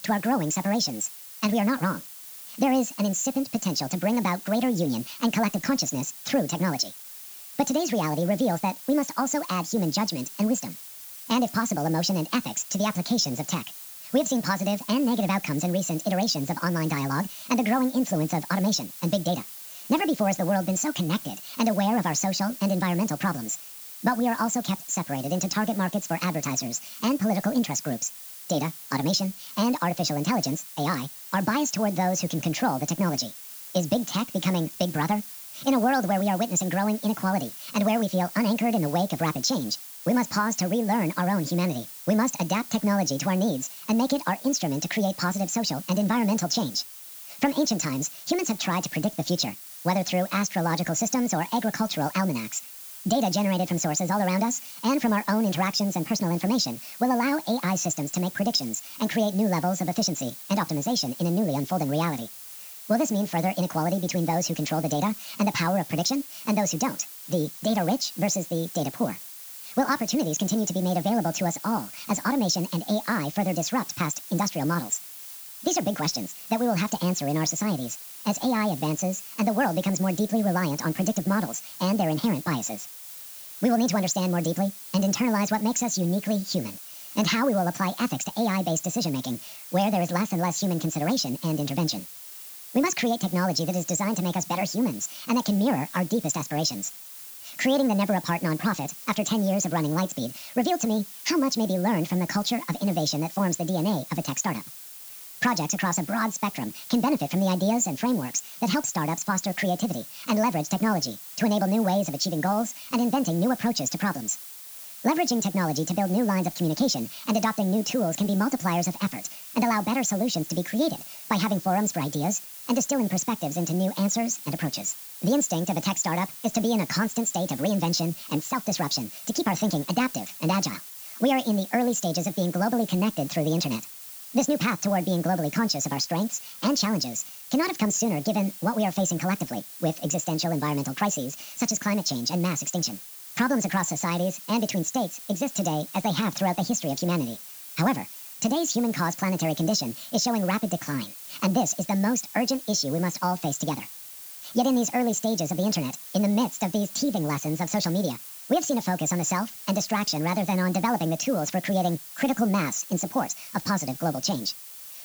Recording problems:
wrong speed and pitch; too fast and too high; 1.6 times normal speed
high frequencies cut off; noticeable; nothing above 8 kHz
hiss; noticeable; throughout; 15 dB below the speech

